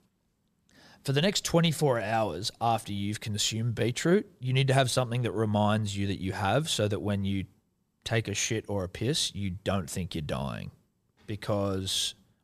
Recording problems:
none

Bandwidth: 14.5 kHz